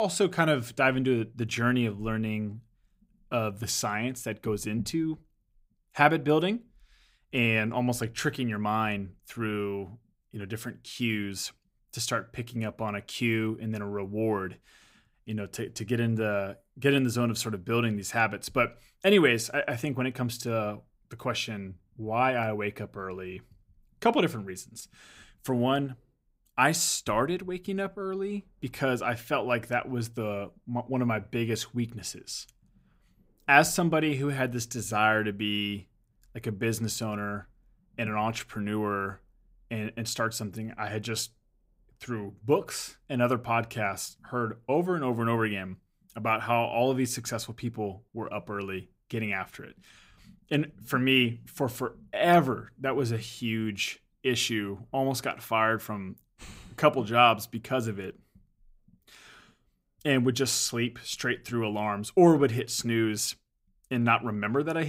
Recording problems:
abrupt cut into speech; at the start and the end

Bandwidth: 15.5 kHz